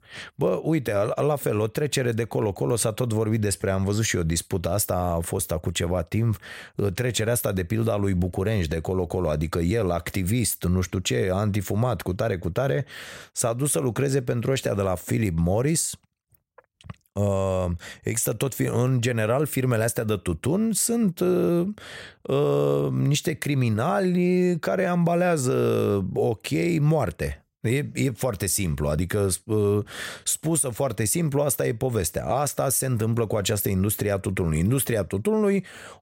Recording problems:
none

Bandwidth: 16 kHz